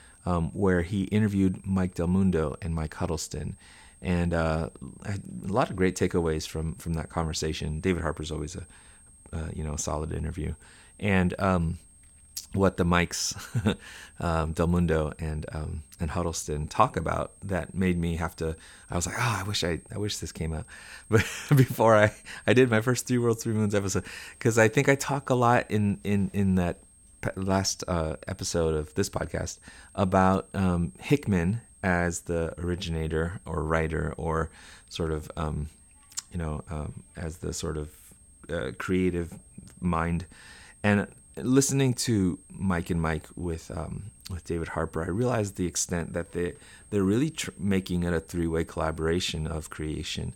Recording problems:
high-pitched whine; faint; throughout; 8.5 kHz, 25 dB below the speech

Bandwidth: 17.5 kHz